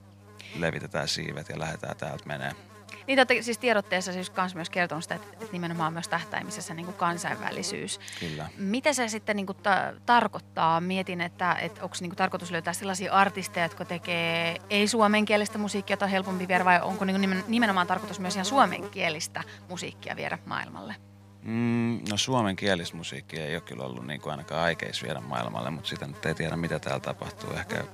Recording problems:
electrical hum; noticeable; throughout; 50 Hz, 20 dB below the speech

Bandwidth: 15 kHz